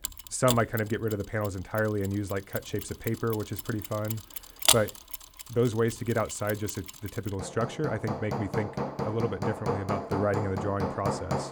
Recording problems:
machinery noise; loud; throughout; 2 dB below the speech

